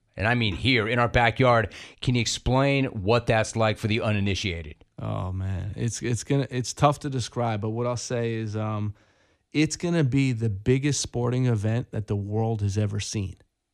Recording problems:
none

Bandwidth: 14.5 kHz